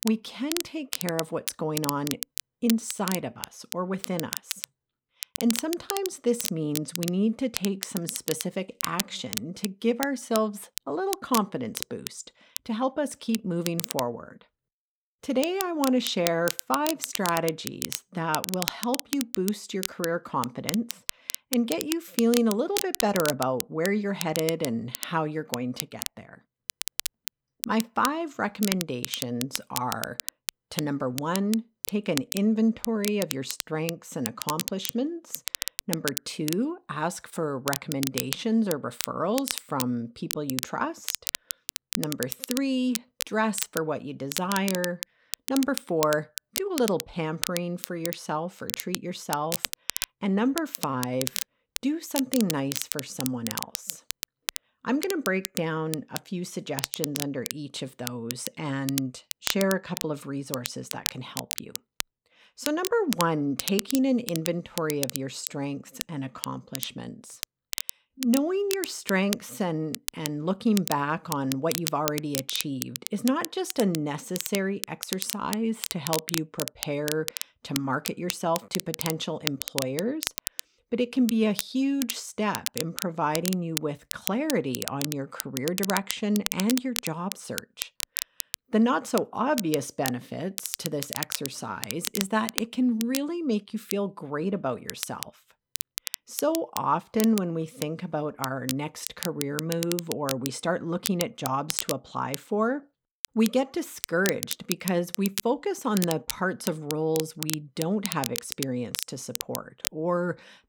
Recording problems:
crackle, like an old record; loud; 5 dB below the speech

